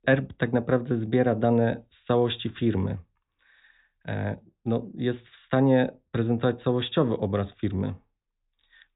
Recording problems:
high frequencies cut off; severe; nothing above 4 kHz

